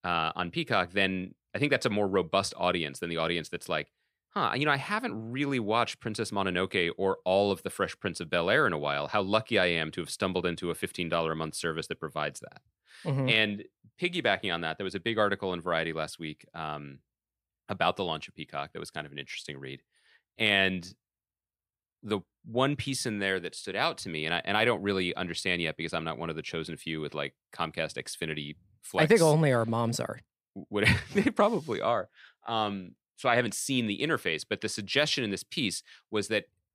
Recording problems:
none

